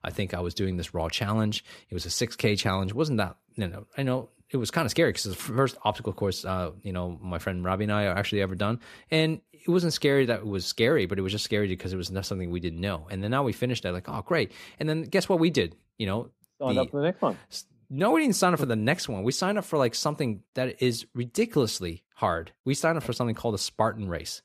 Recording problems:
none

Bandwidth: 14.5 kHz